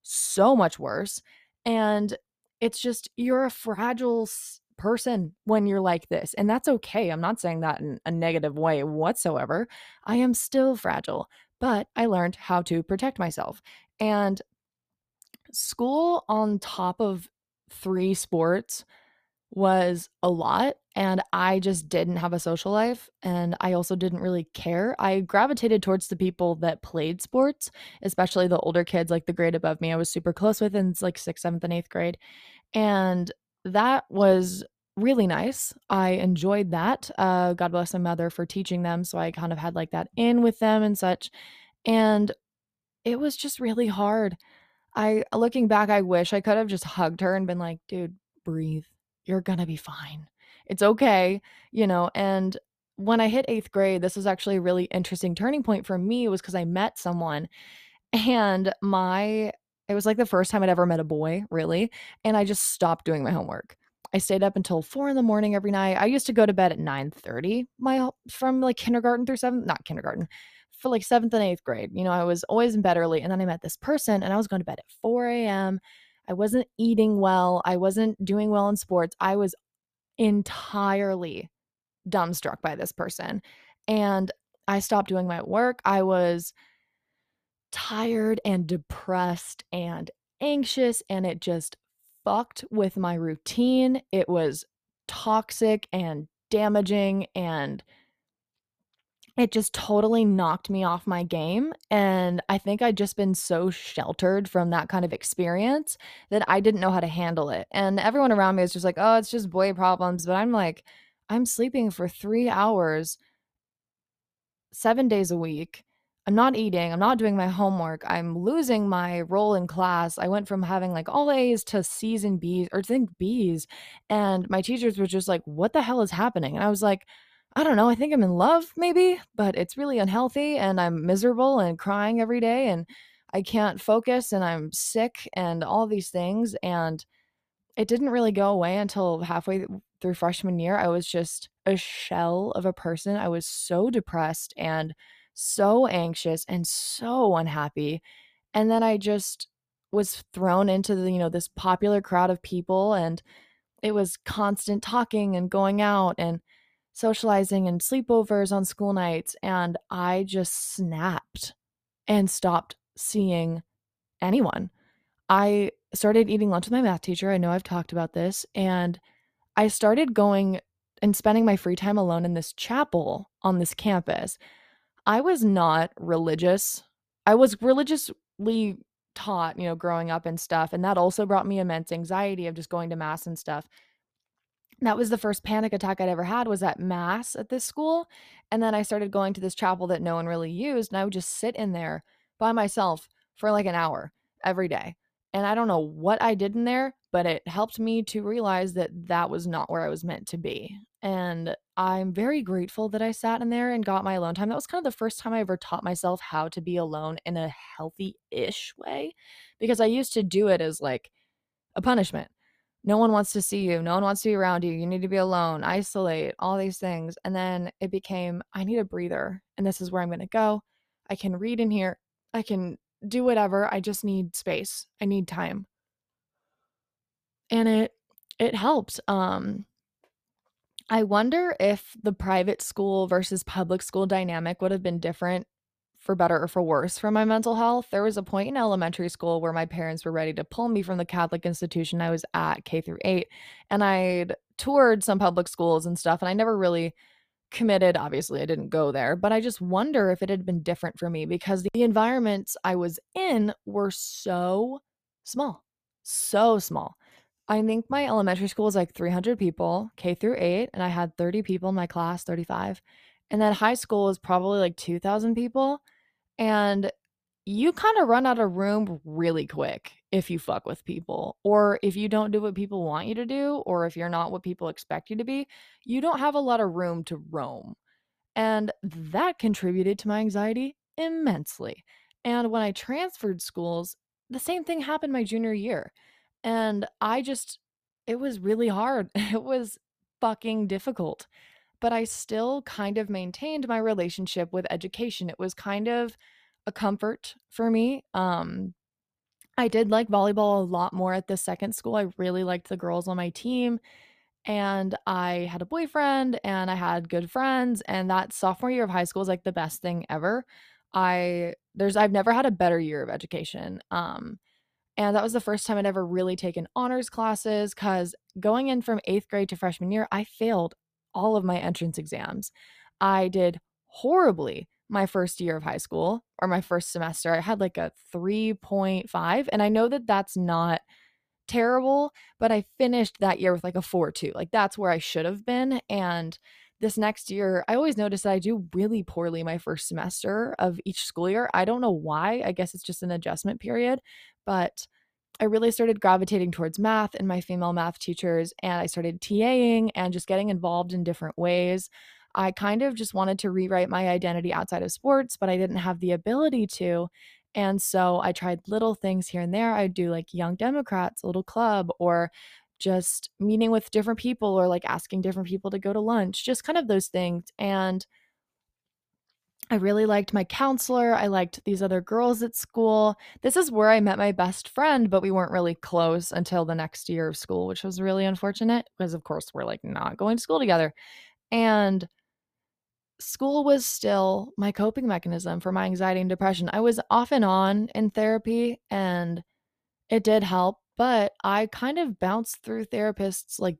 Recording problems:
none

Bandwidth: 14.5 kHz